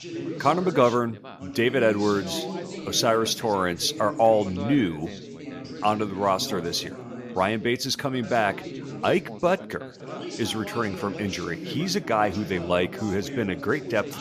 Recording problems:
background chatter; noticeable; throughout; 4 voices, 10 dB below the speech

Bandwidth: 14.5 kHz